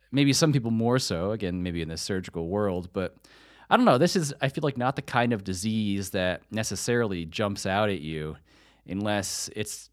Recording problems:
none

